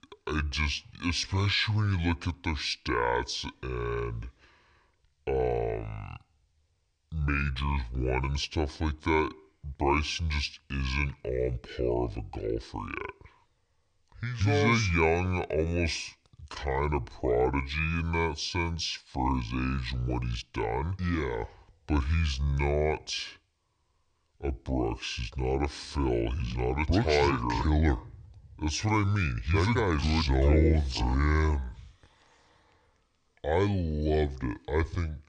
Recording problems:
wrong speed and pitch; too slow and too low; 0.6 times normal speed

